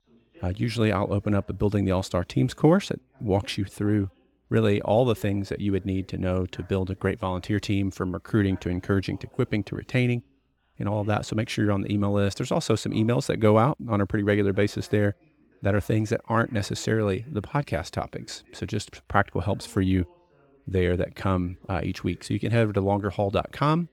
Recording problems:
voice in the background; faint; throughout; 30 dB below the speech

